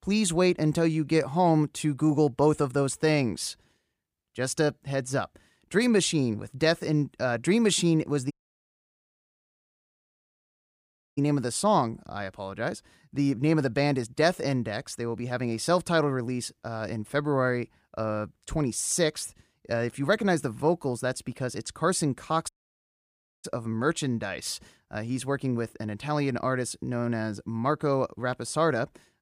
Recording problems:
audio cutting out; at 8.5 s for 3 s and at 22 s for 1 s

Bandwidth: 15 kHz